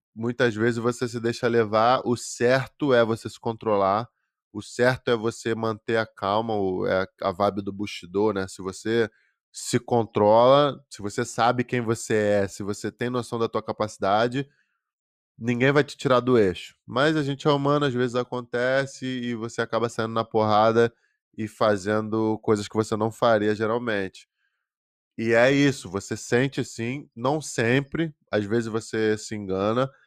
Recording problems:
none

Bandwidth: 15 kHz